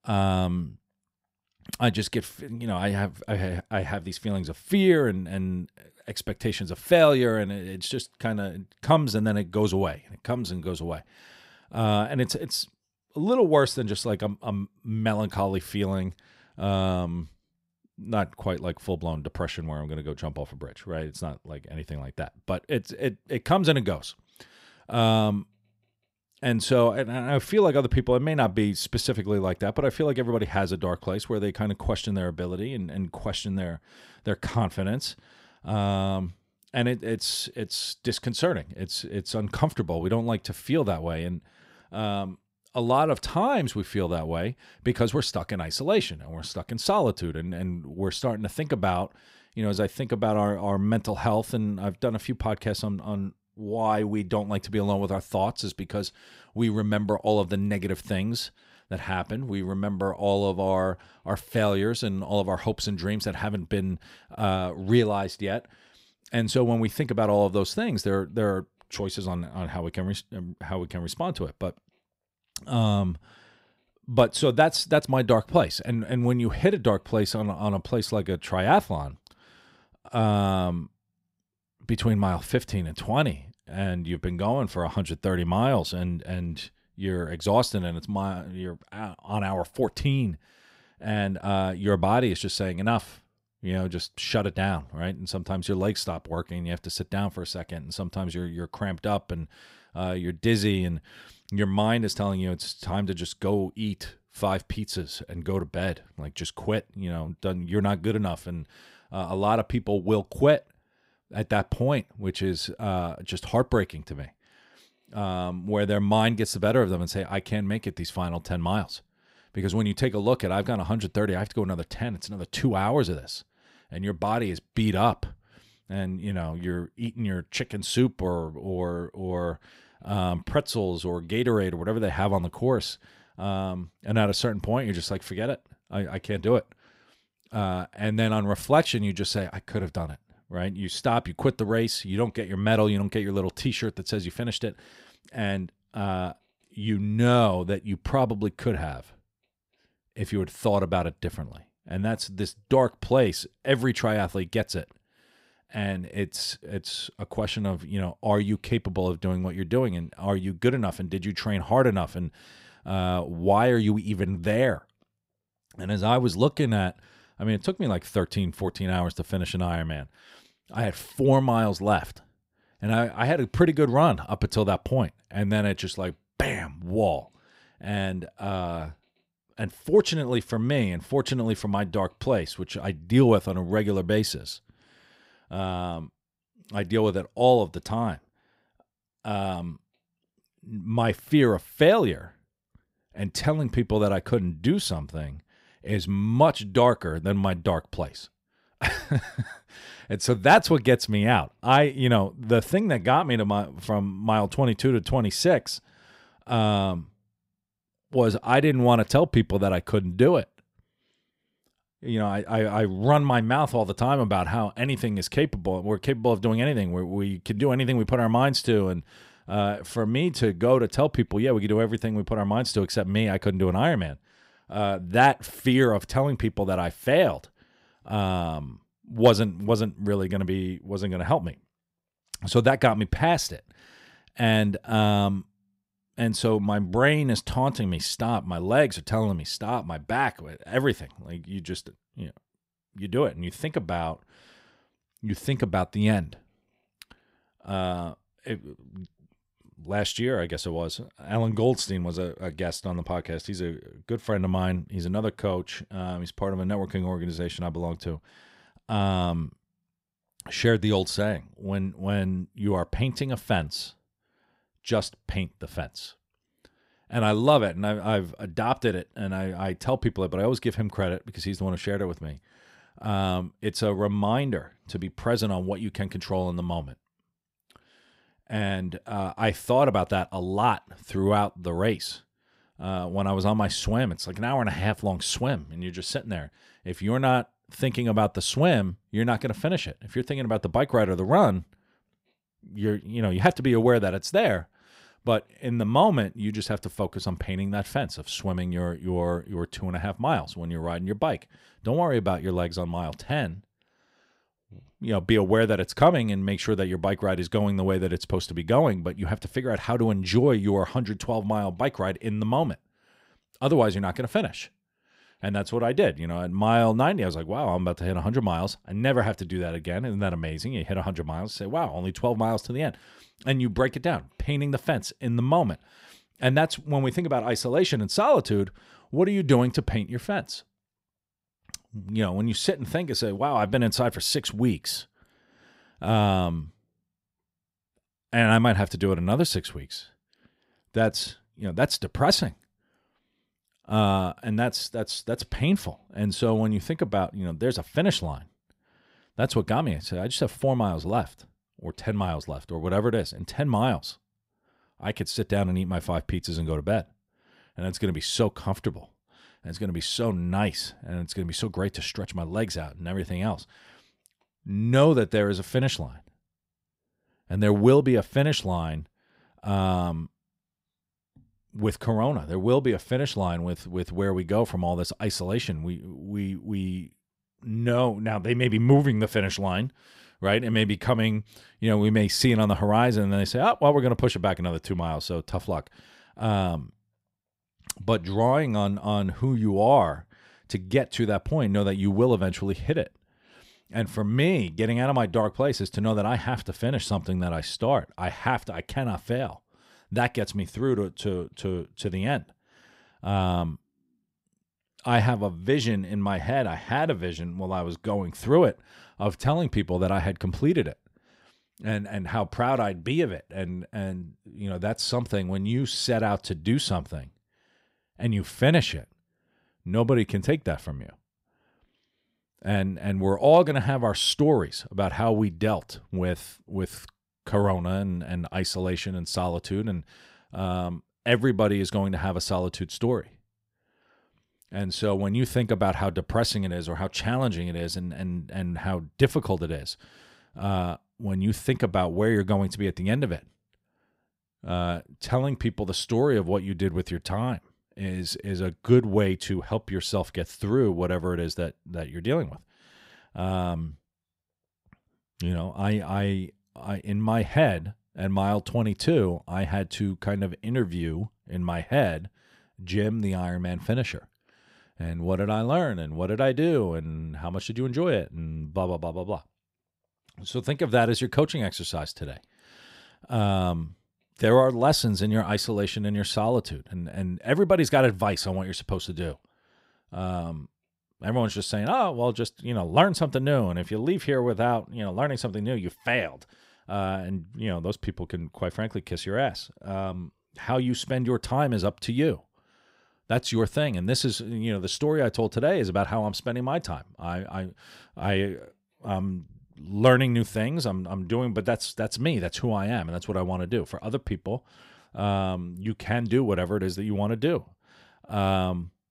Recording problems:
none

